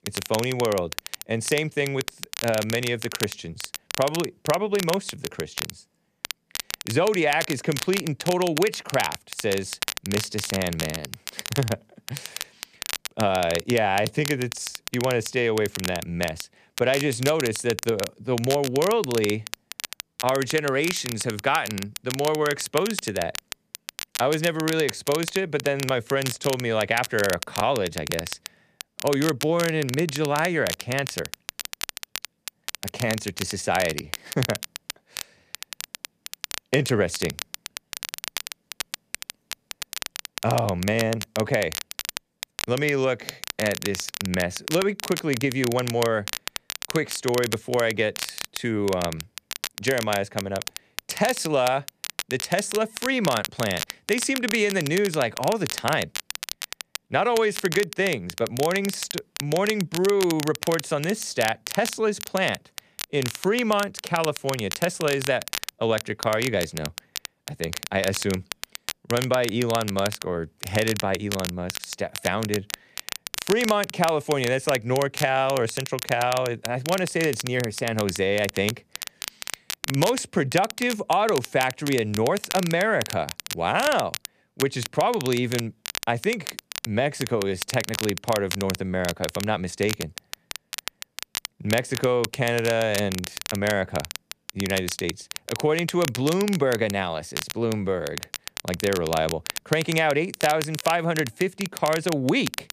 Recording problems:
crackle, like an old record; loud; 8 dB below the speech

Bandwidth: 14.5 kHz